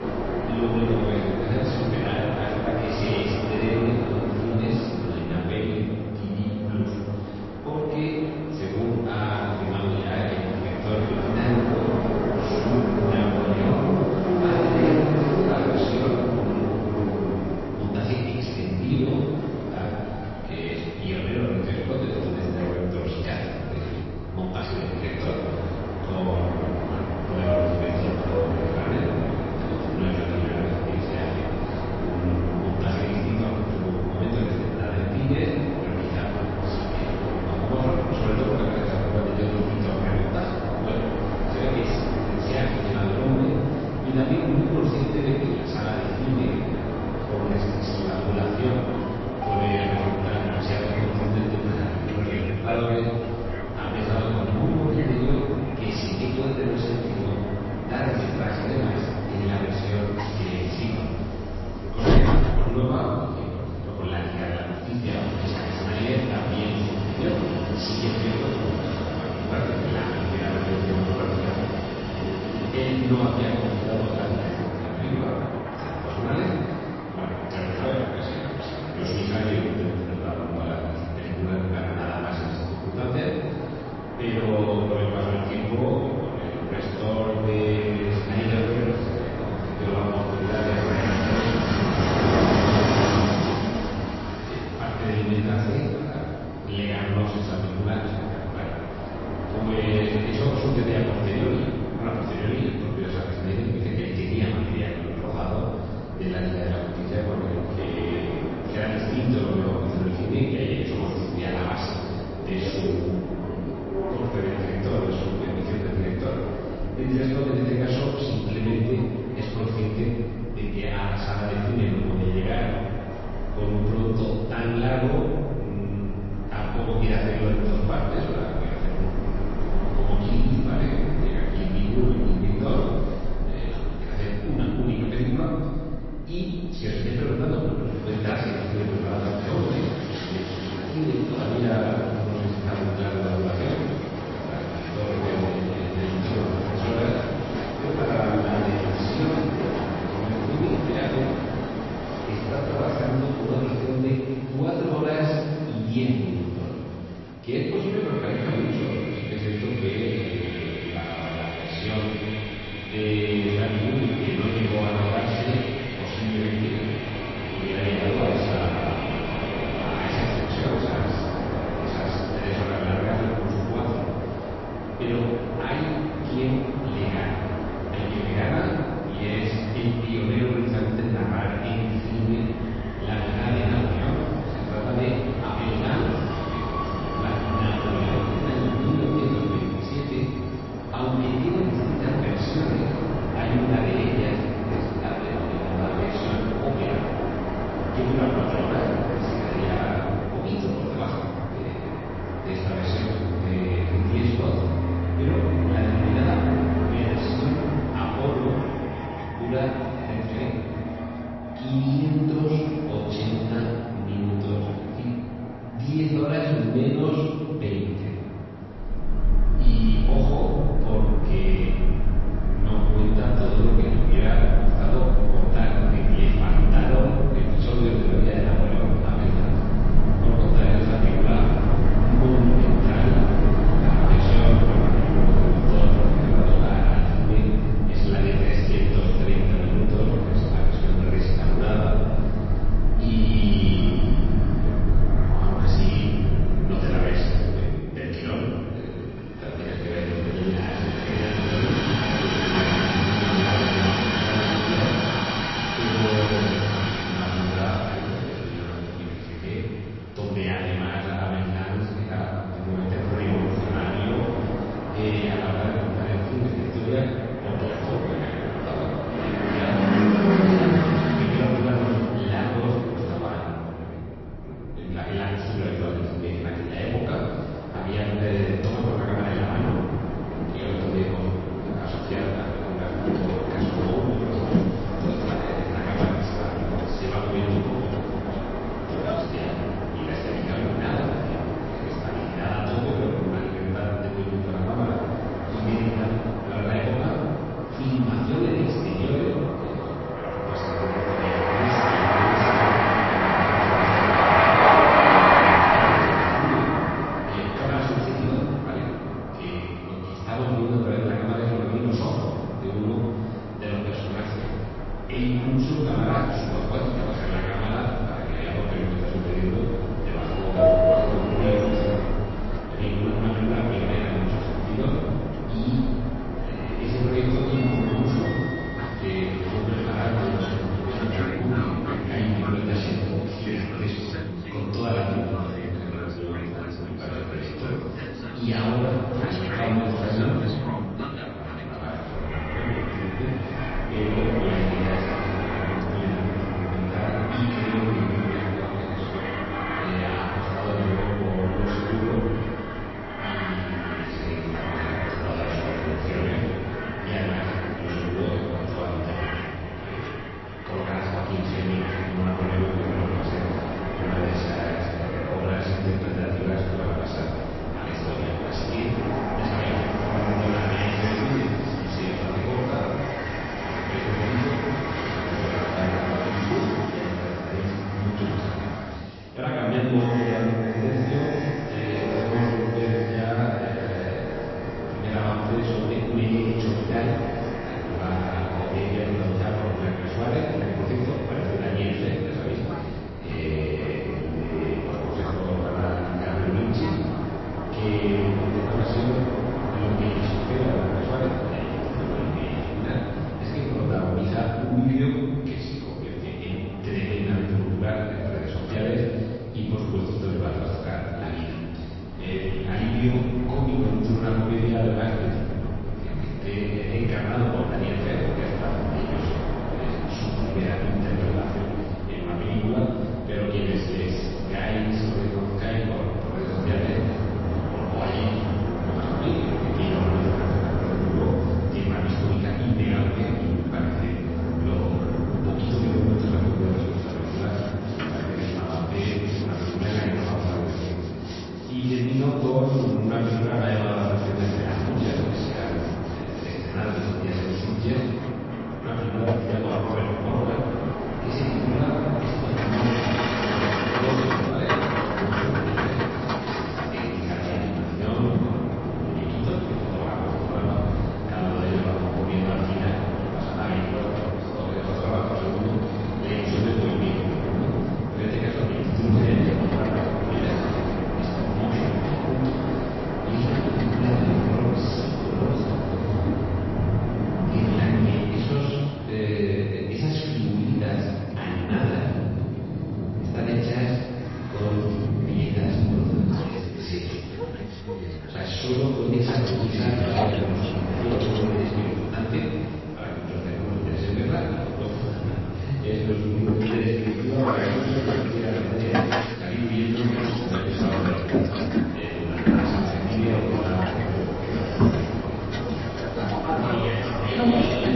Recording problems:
room echo; strong; dies away in 2 s
off-mic speech; far
garbled, watery; slightly; nothing above 5.5 kHz
train or aircraft noise; loud; throughout; 1 dB below the speech

